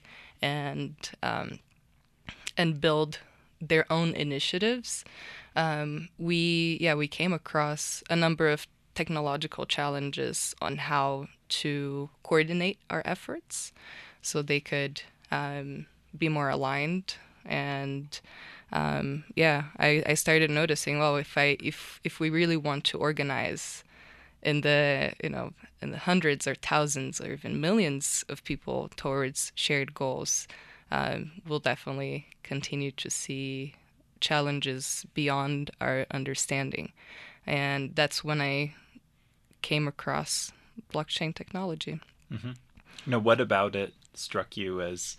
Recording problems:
none

